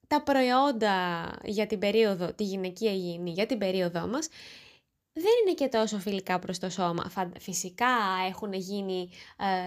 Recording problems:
abrupt cut into speech; at the end

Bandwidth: 15 kHz